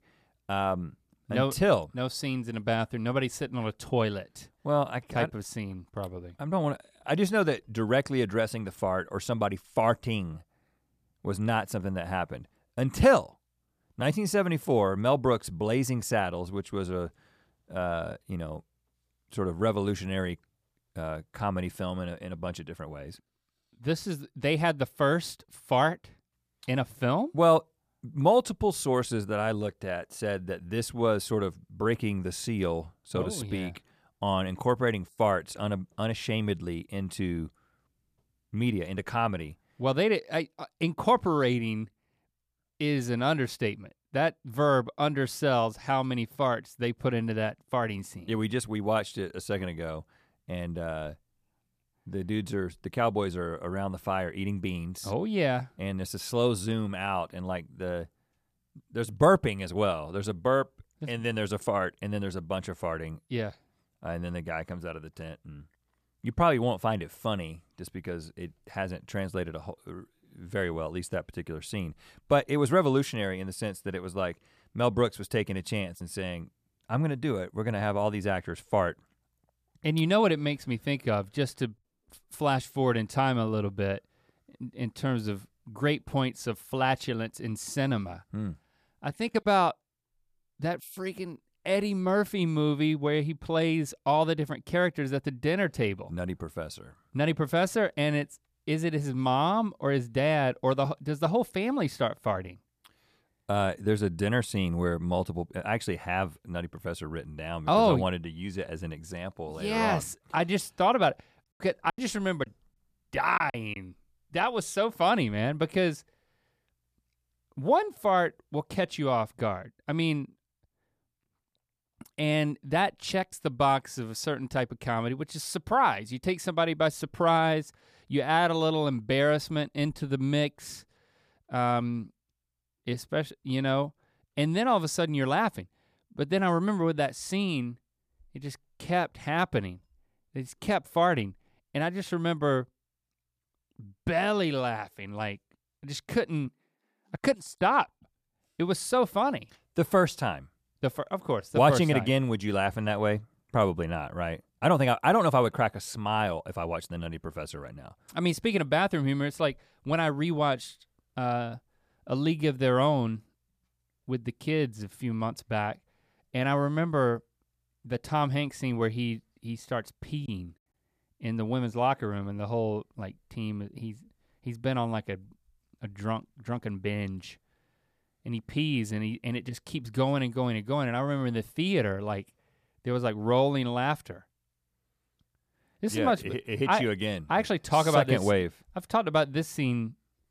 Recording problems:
choppy; very; from 1:52 to 1:54 and at 2:50; 9% of the speech affected

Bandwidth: 14.5 kHz